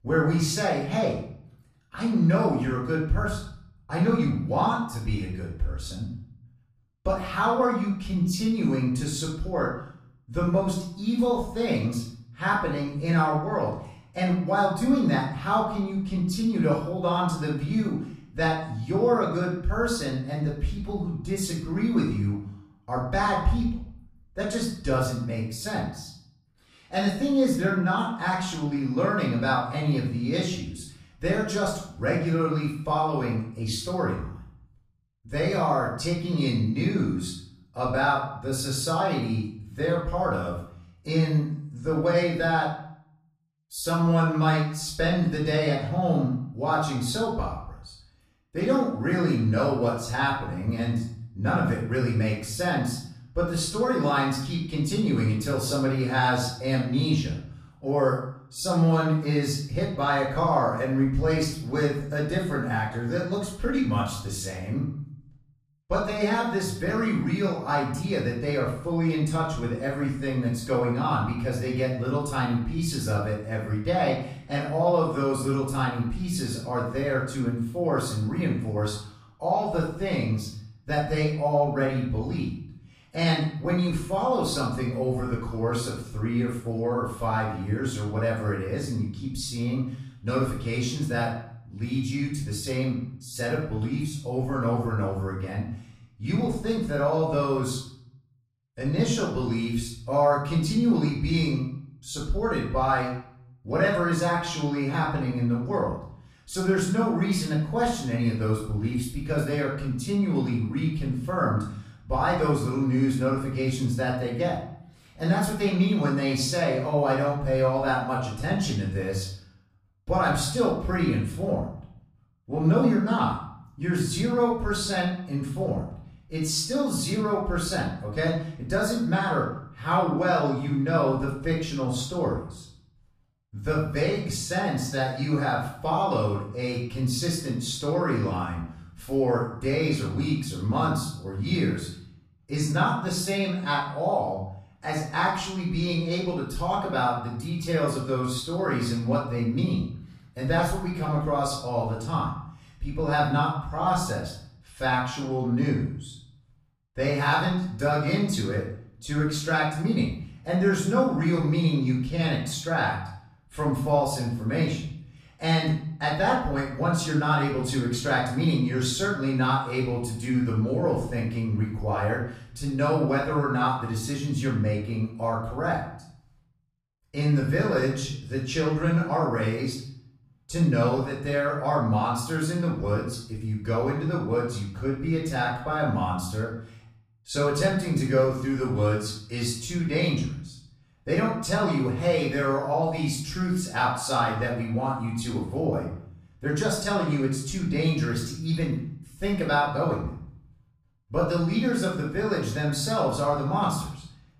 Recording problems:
off-mic speech; far
room echo; noticeable; dies away in 0.6 s

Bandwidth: 14.5 kHz